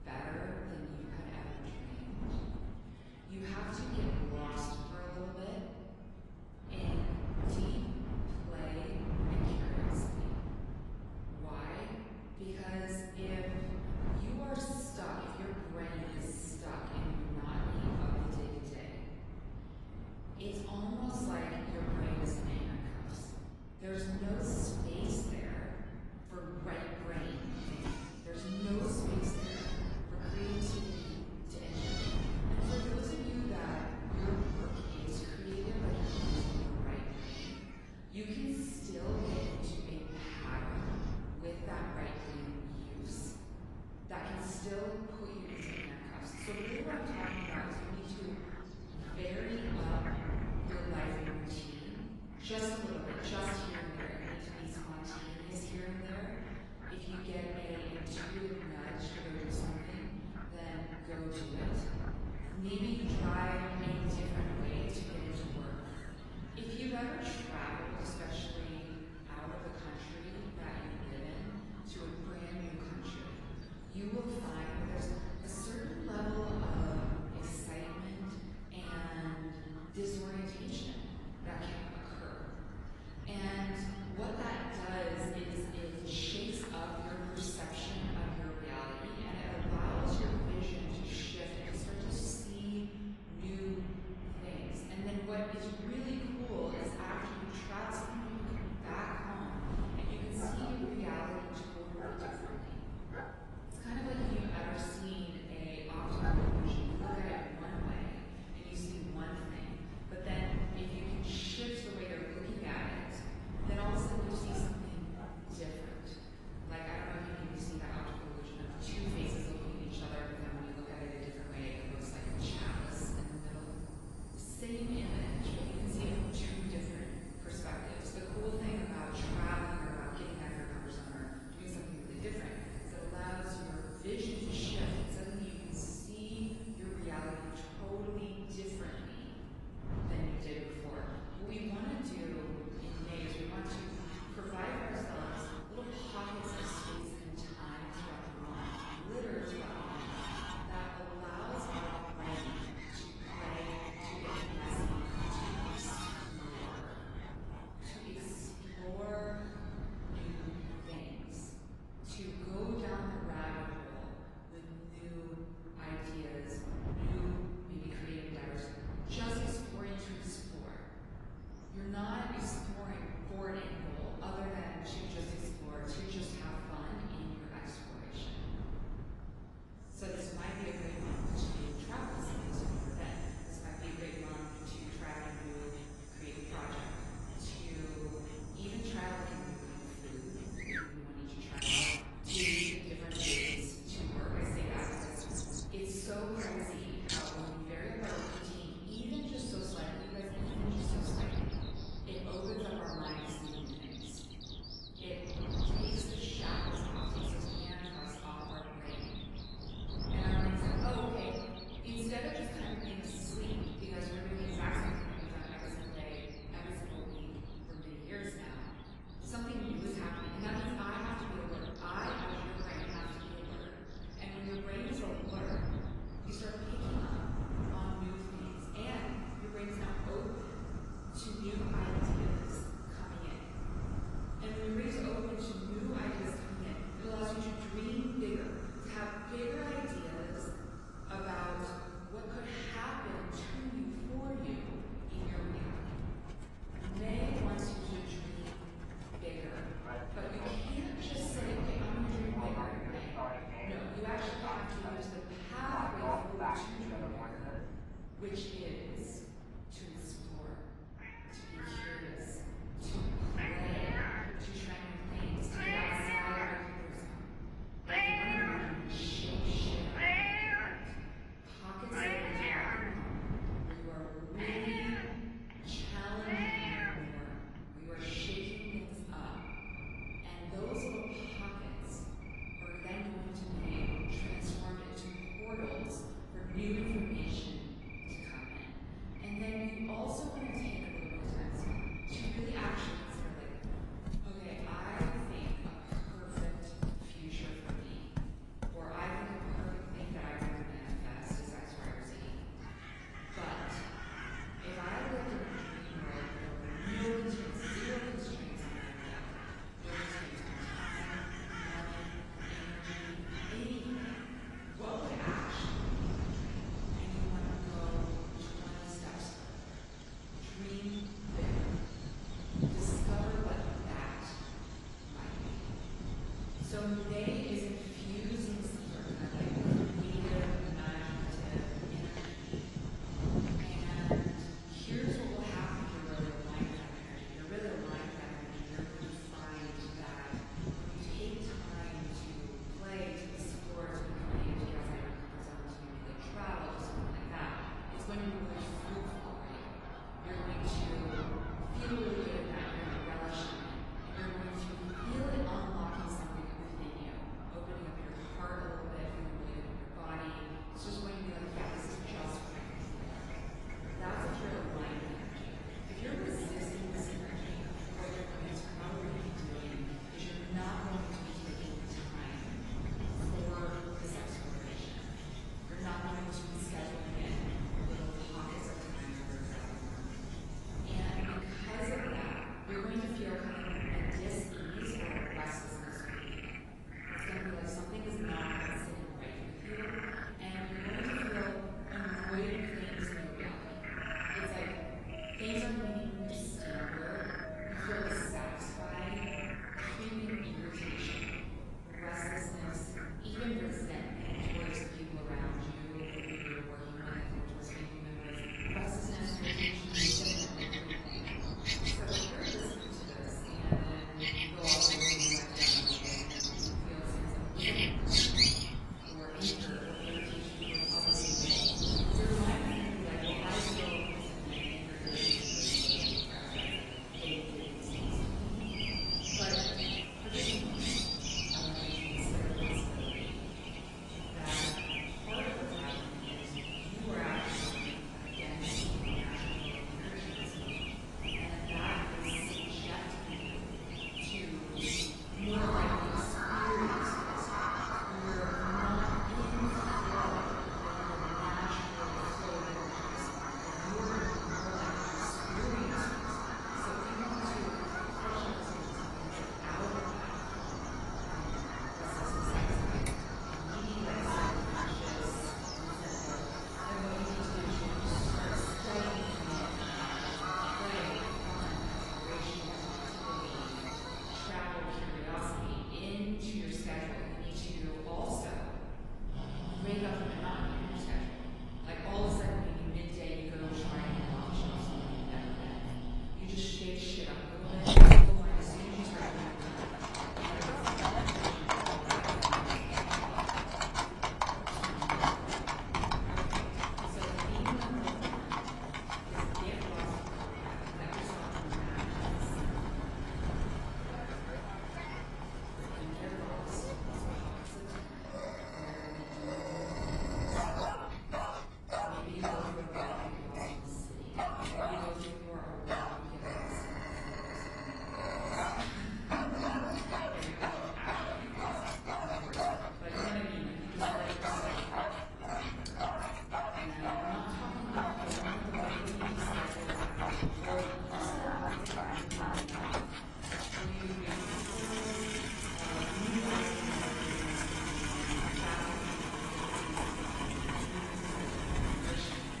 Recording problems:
off-mic speech; far
room echo; noticeable; dies away in 2 s
garbled, watery; slightly; nothing above 10.5 kHz
animal sounds; very loud; throughout; 5 dB above the speech
wind noise on the microphone; heavy; 9 dB below the speech

